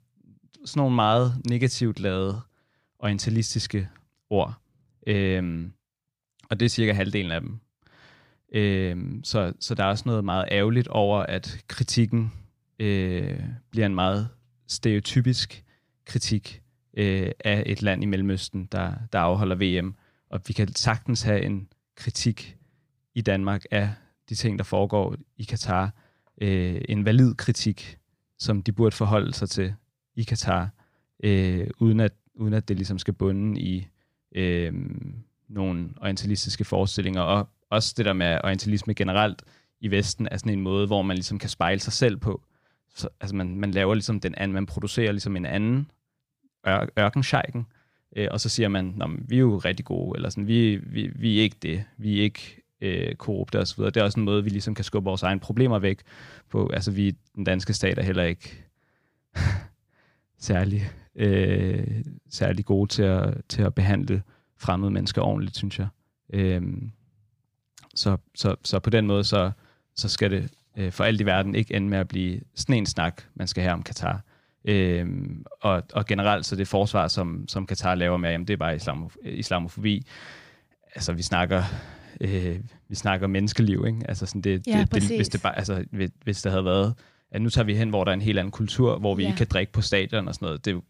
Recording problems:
none

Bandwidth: 15 kHz